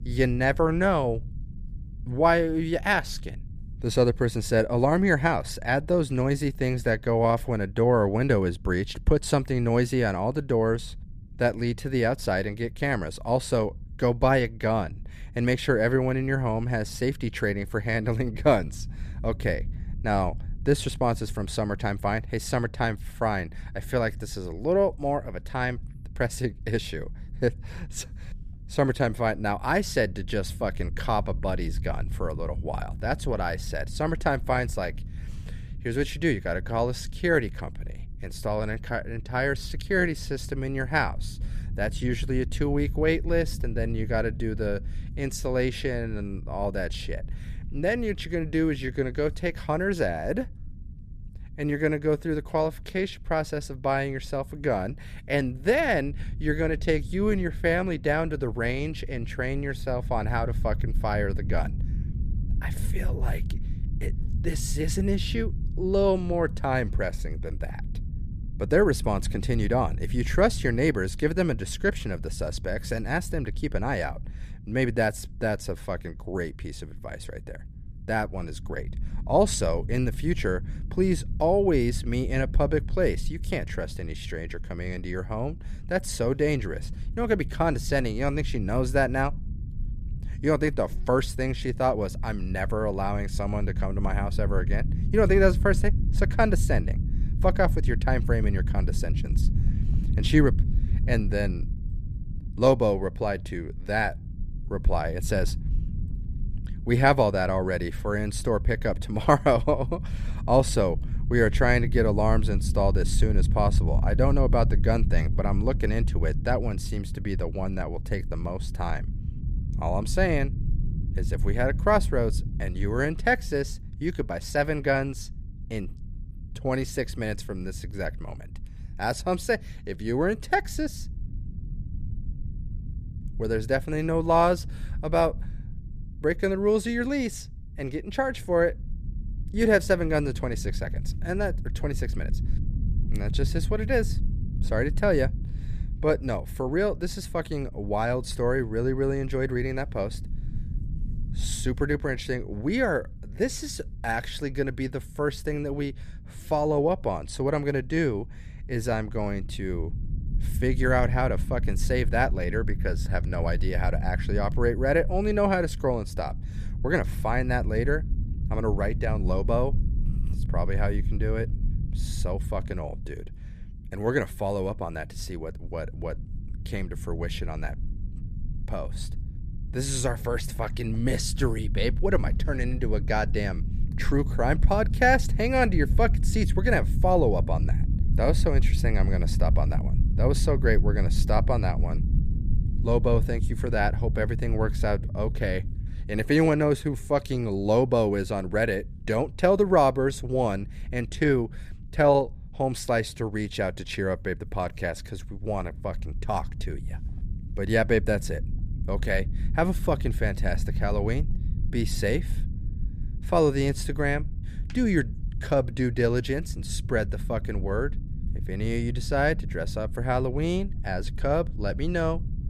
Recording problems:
low rumble; faint; throughout; 20 dB below the speech

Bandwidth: 14.5 kHz